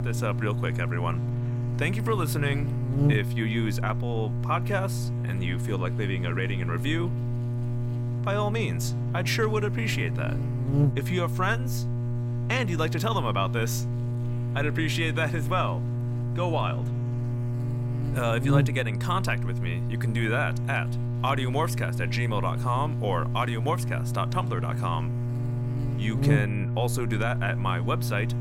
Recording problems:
electrical hum; loud; throughout; 60 Hz, 9 dB below the speech

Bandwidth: 16 kHz